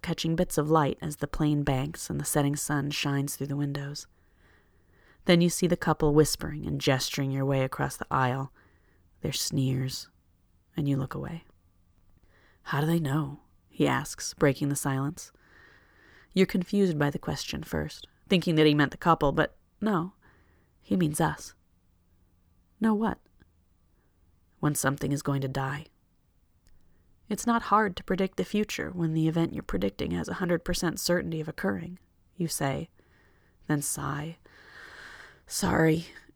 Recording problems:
none

